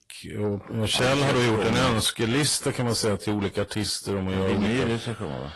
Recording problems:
distortion; heavy; 6 dB below the speech
garbled, watery; slightly; nothing above 11.5 kHz

